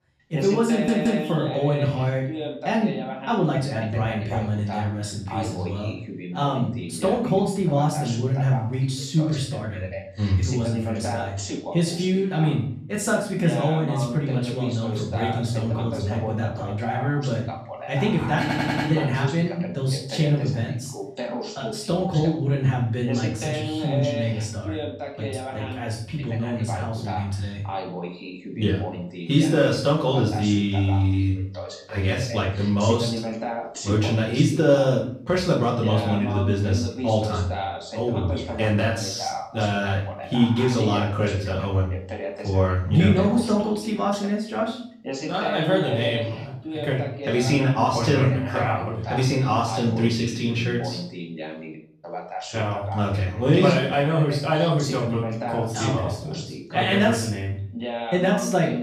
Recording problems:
off-mic speech; far
room echo; noticeable; dies away in 0.5 s
voice in the background; loud; throughout; 9 dB below the speech
audio stuttering; at 0.5 s and at 18 s

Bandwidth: 15 kHz